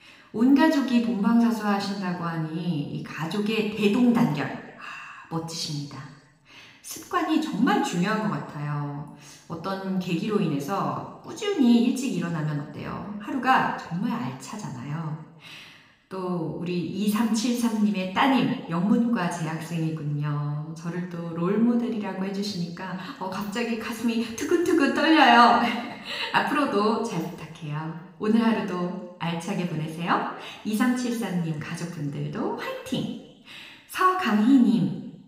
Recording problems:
room echo; noticeable; dies away in 1 s
off-mic speech; somewhat distant

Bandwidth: 15.5 kHz